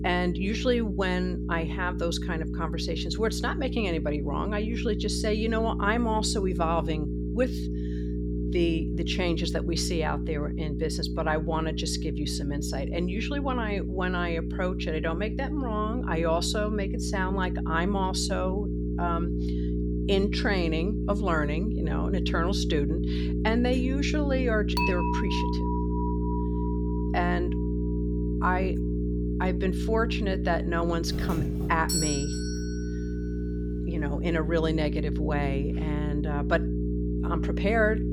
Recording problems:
electrical hum; loud; throughout; 60 Hz, 7 dB below the speech
clattering dishes; loud; from 25 to 27 s; peak 1 dB above the speech
doorbell; loud; from 31 to 33 s; peak 2 dB above the speech

